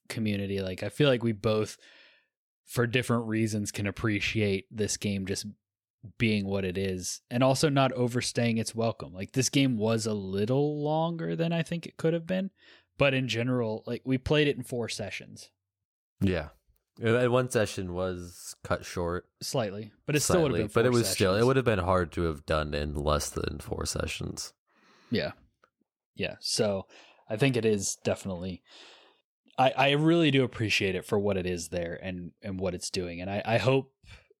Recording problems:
none

